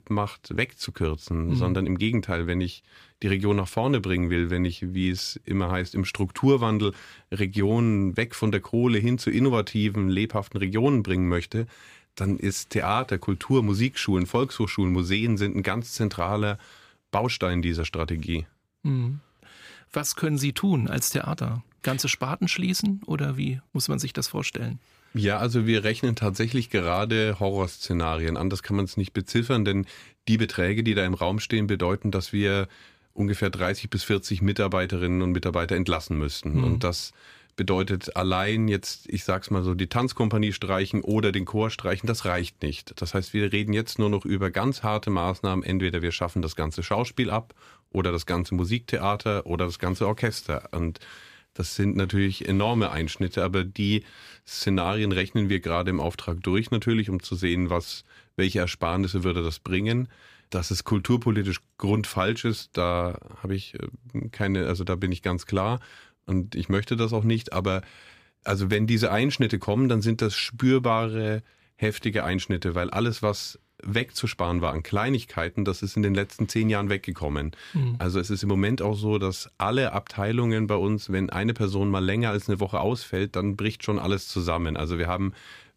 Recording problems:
none

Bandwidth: 15 kHz